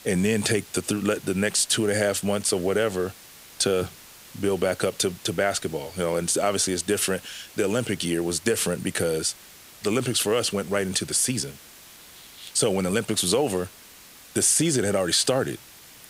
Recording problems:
hiss; faint; throughout; 20 dB below the speech

